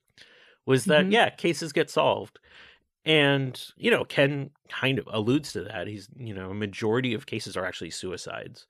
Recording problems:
uneven, jittery; strongly; from 0.5 to 8 s

